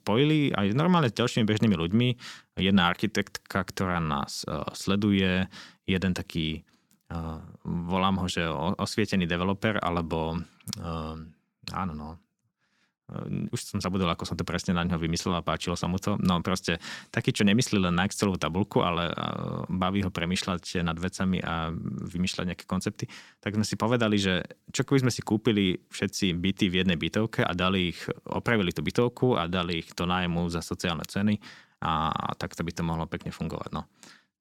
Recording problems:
none

